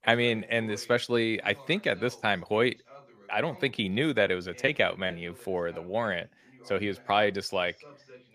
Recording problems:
voice in the background; faint; throughout; 25 dB below the speech

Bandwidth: 15 kHz